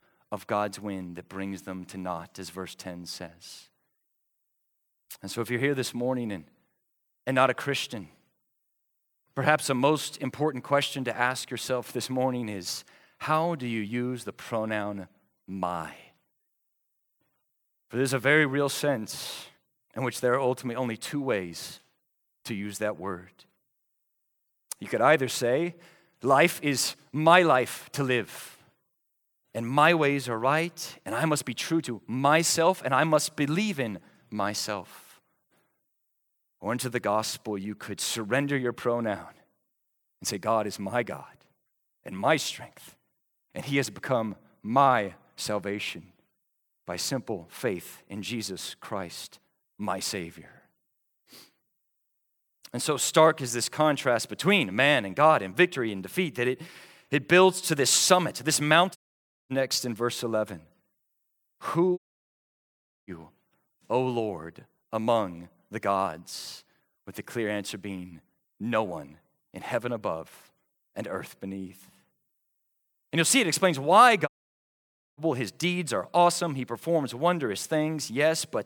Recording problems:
audio cutting out; at 59 s for 0.5 s, at 1:02 for 1 s and at 1:14 for 1 s

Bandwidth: 18.5 kHz